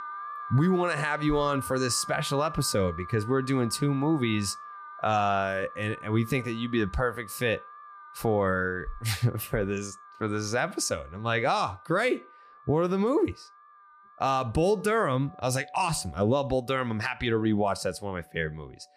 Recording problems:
alarms or sirens; noticeable; throughout; 15 dB below the speech

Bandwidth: 15 kHz